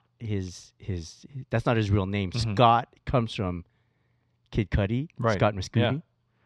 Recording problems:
muffled; very slightly; fading above 4 kHz

